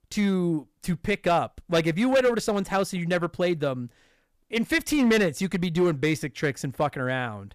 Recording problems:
distortion; slight; 4% of the sound clipped

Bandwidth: 14.5 kHz